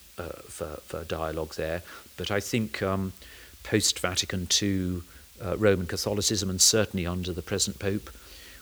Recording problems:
hiss; faint; throughout; 20 dB below the speech

